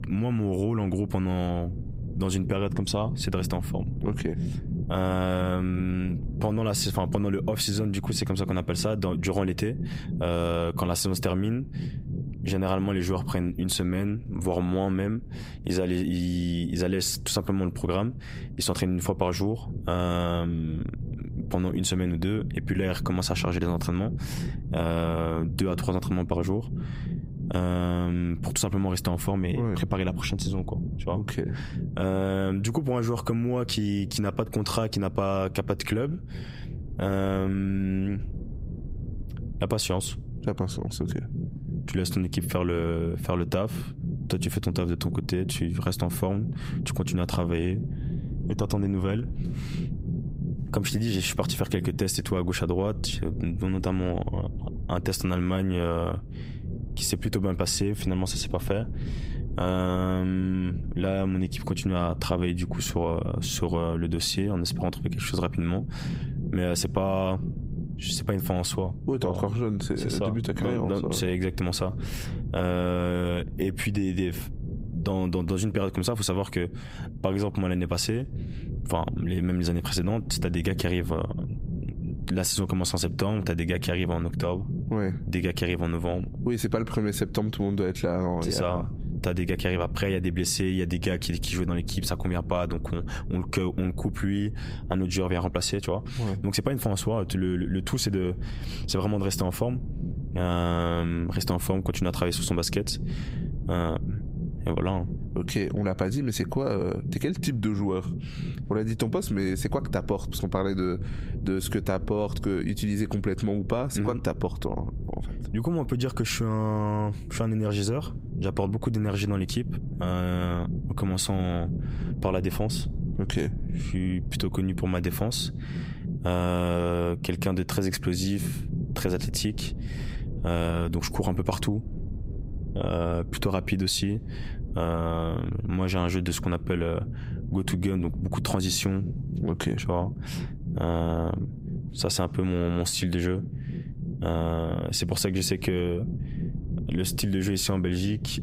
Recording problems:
squashed, flat; heavily
low rumble; noticeable; throughout; 15 dB below the speech

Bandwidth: 15.5 kHz